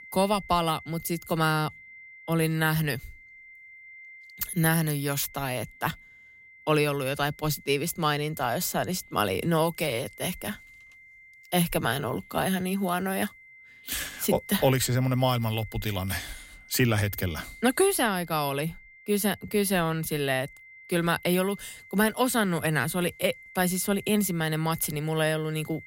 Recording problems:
high-pitched whine; faint; throughout; 2 kHz, 20 dB below the speech

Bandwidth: 16 kHz